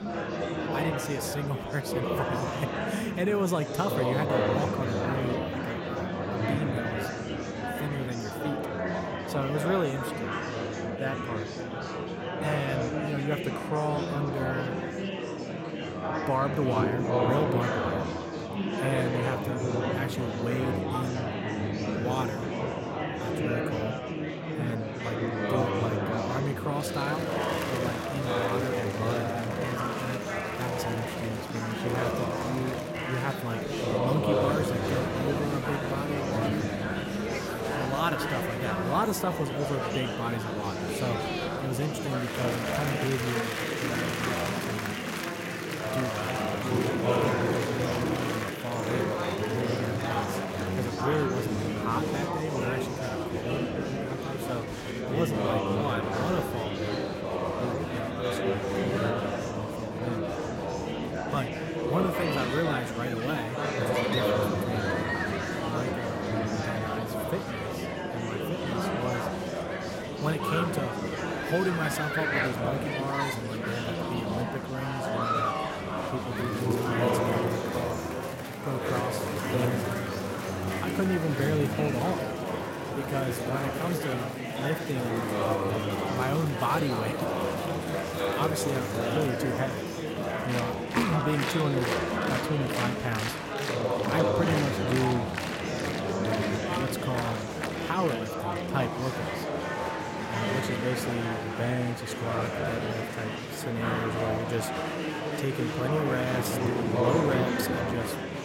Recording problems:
murmuring crowd; very loud; throughout; 3 dB above the speech

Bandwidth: 16 kHz